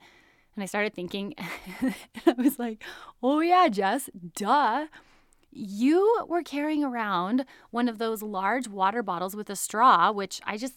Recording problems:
none

